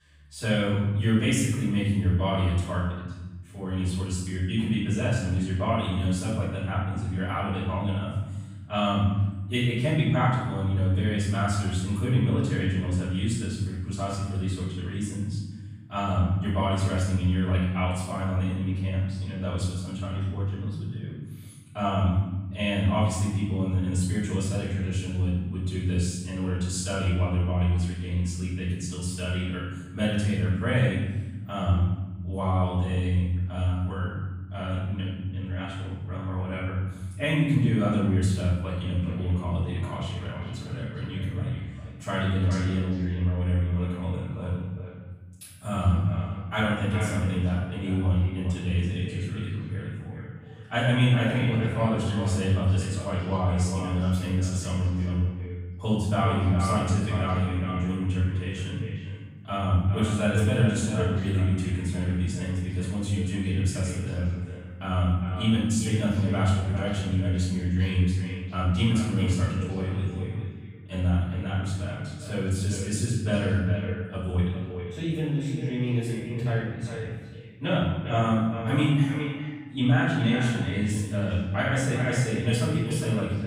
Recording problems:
echo of what is said; strong; from 39 s on; 400 ms later, 10 dB below the speech
room echo; strong; dies away in 1.2 s
off-mic speech; far

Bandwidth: 15.5 kHz